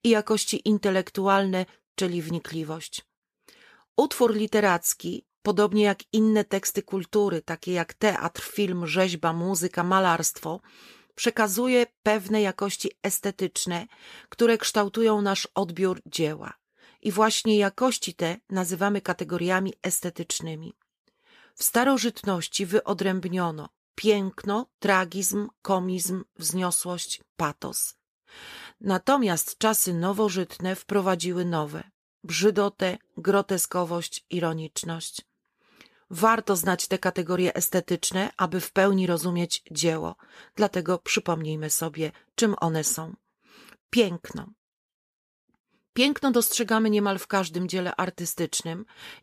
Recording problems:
none

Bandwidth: 14.5 kHz